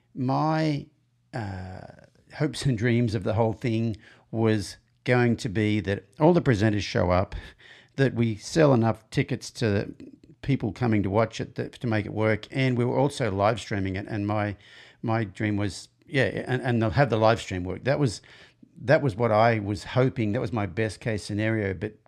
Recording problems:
none

